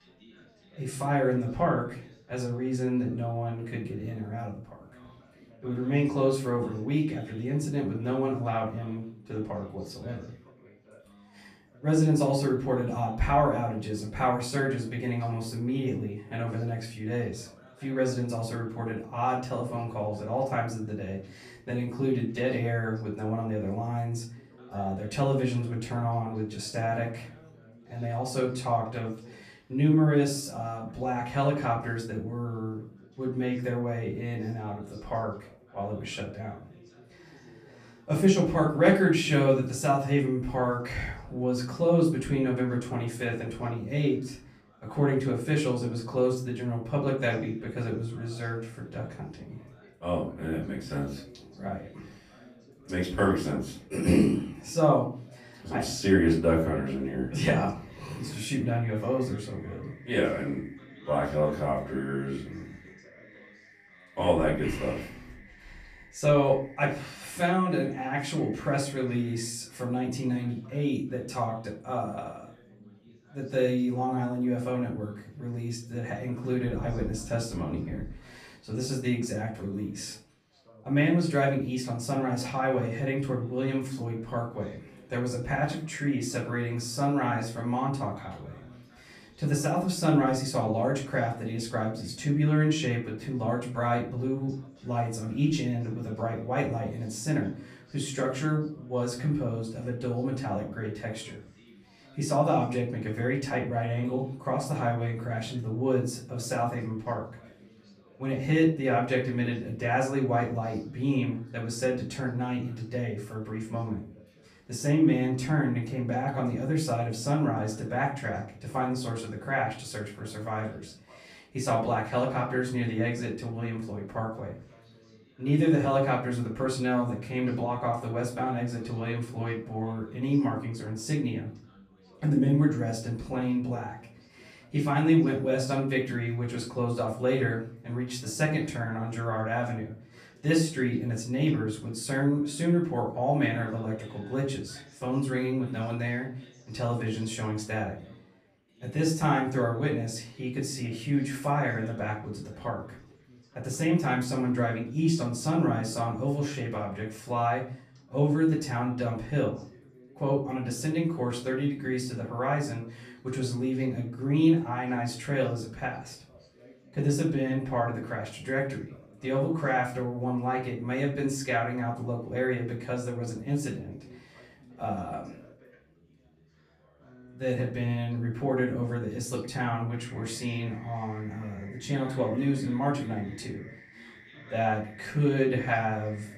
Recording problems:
off-mic speech; far
room echo; slight; dies away in 0.4 s
background chatter; faint; throughout; 4 voices, 25 dB below the speech

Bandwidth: 14.5 kHz